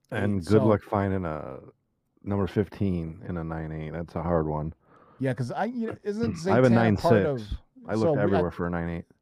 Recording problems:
muffled; slightly; fading above 1.5 kHz

